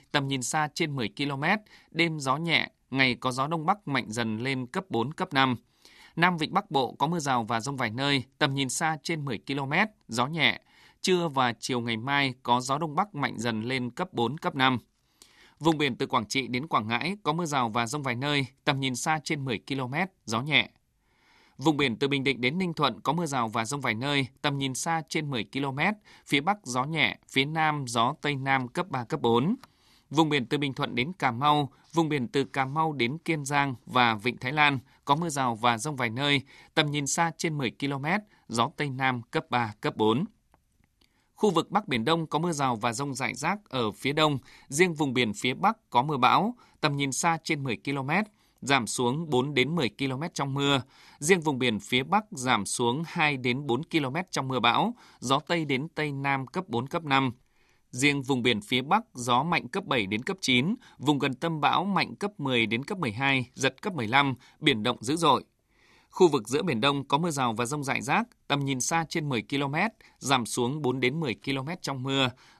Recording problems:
none

